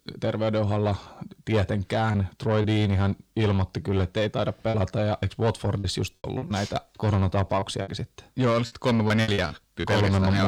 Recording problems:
distortion; slight; 10 dB below the speech
choppy; very; from 4.5 to 7 s and from 7.5 to 10 s; 10% of the speech affected
abrupt cut into speech; at the end

